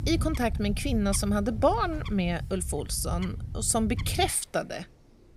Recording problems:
animal sounds; loud; throughout; 7 dB below the speech

